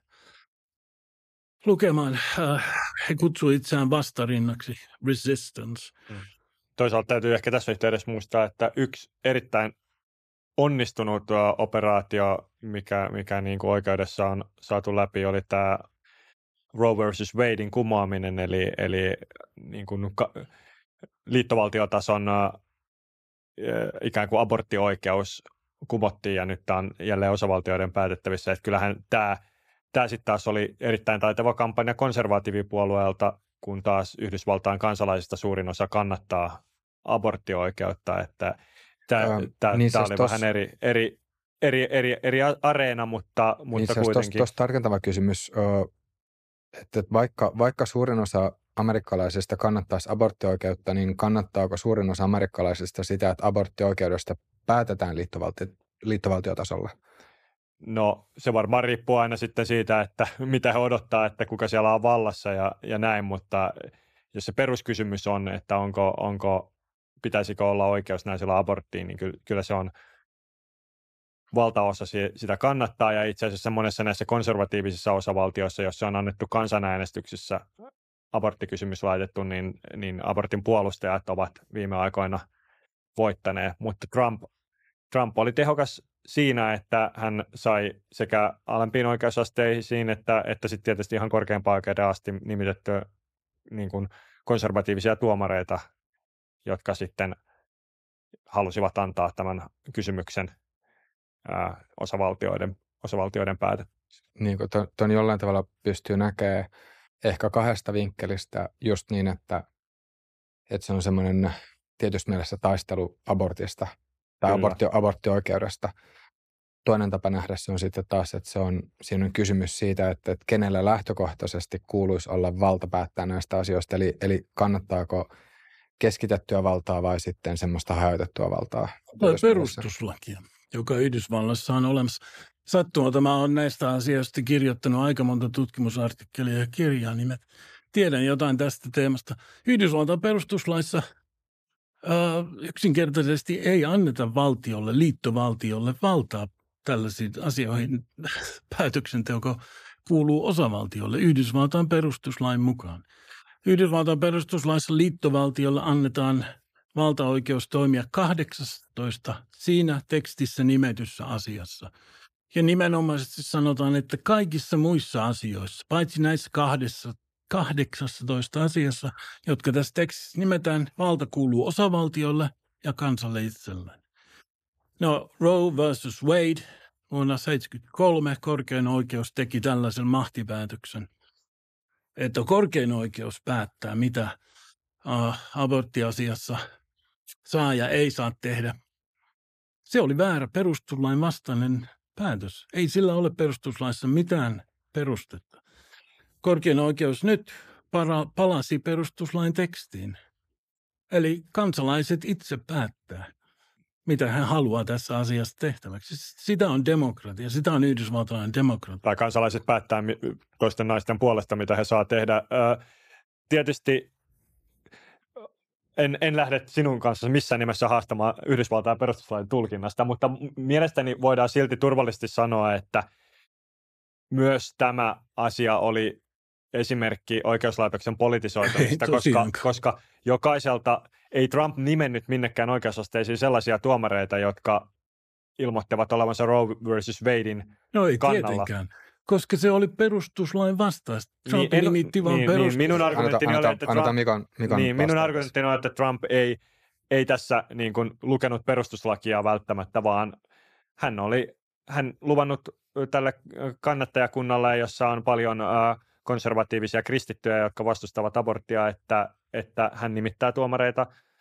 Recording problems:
none

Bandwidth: 14.5 kHz